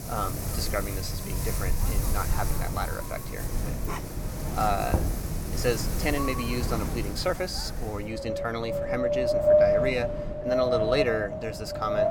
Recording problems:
wind in the background; very loud; throughout; 3 dB above the speech
dog barking; noticeable; at 4 s; peak 7 dB below the speech
door banging; loud; at 5 s; peak 2 dB above the speech

